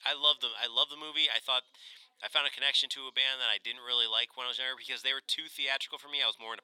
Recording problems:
thin; very; fading below 850 Hz
background chatter; very faint; throughout; 2 voices, 40 dB below the speech

